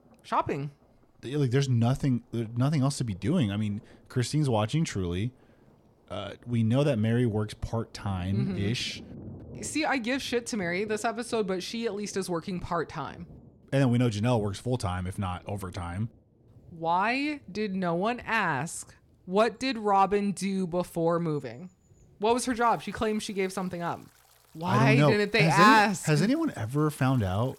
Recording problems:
rain or running water; faint; throughout; 25 dB below the speech

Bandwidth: 17 kHz